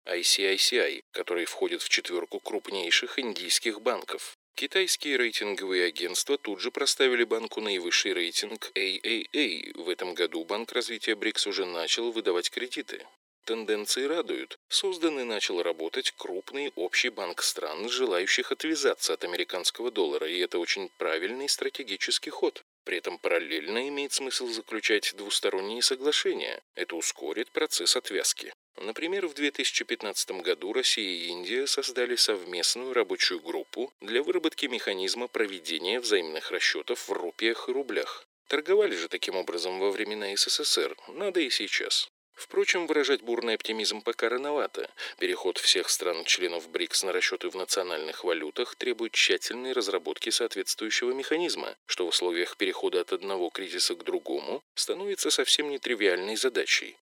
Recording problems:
thin; very; fading below 350 Hz

